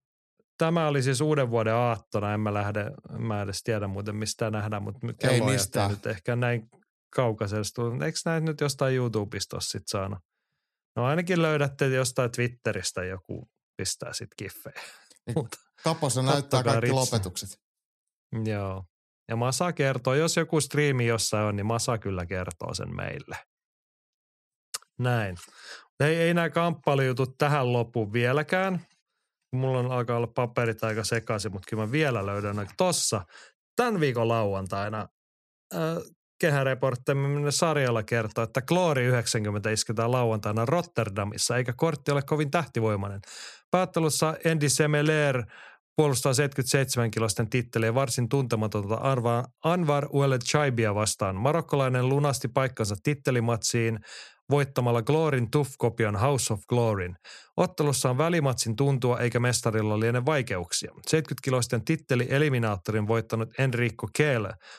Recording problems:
none

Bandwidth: 13.5 kHz